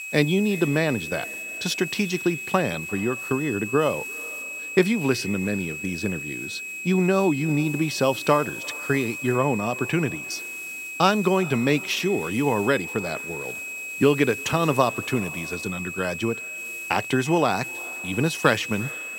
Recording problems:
echo of what is said; faint; throughout; 350 ms later, 20 dB below the speech
high-pitched whine; loud; throughout; 2.5 kHz, 7 dB below the speech
hiss; faint; throughout; 20 dB below the speech

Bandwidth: 16 kHz